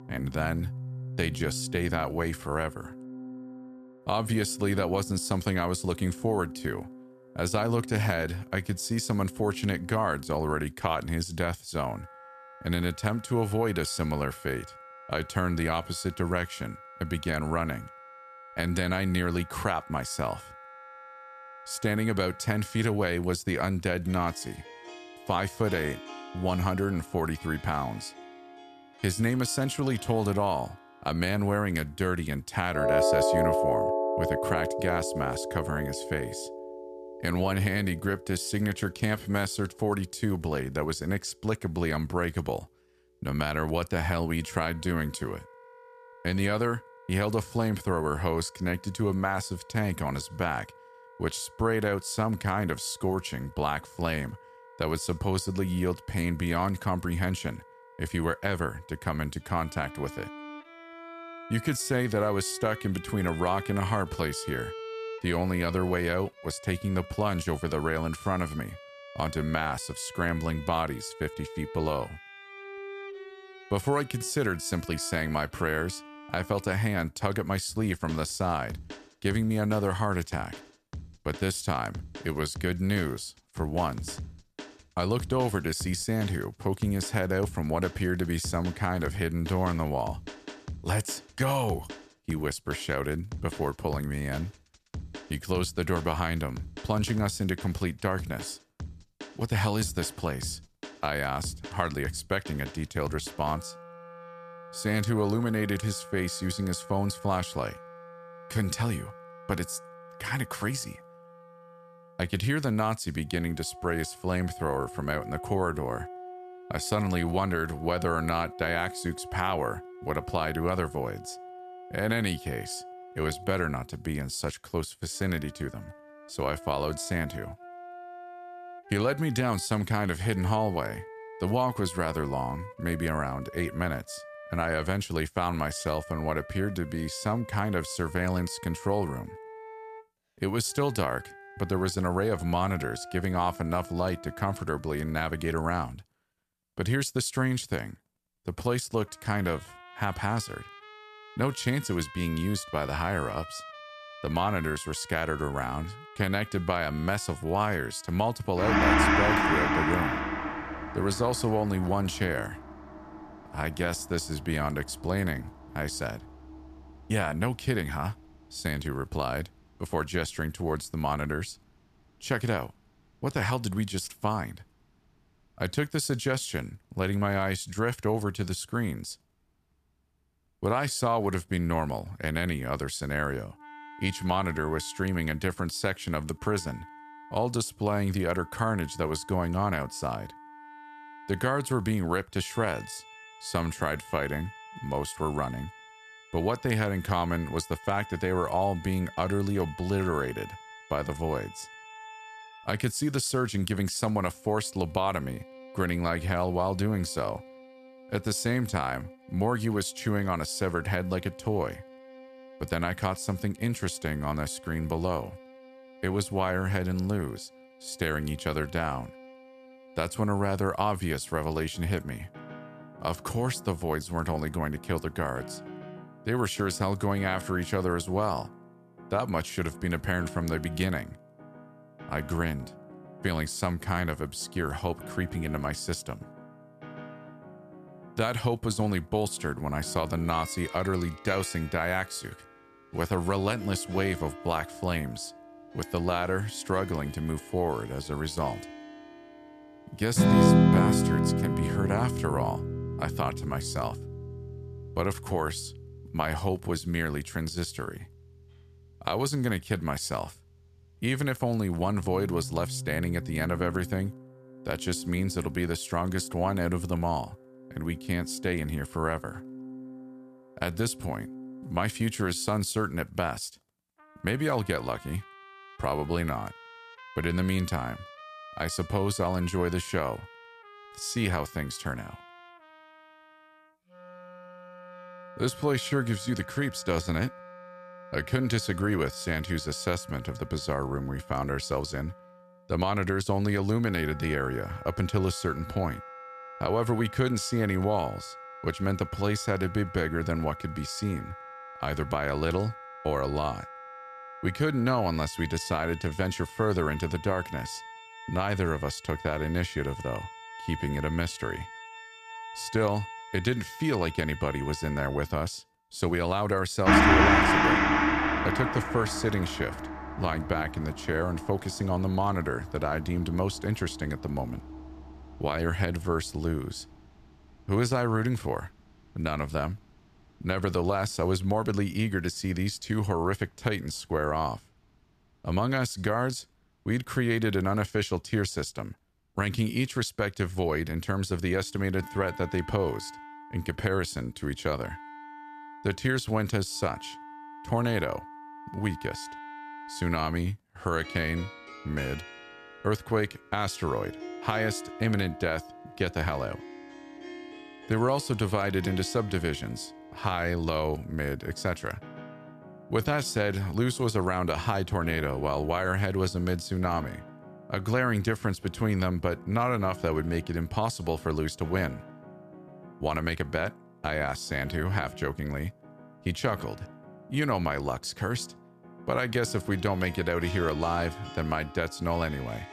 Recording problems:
background music; loud; throughout; 7 dB below the speech

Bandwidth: 14.5 kHz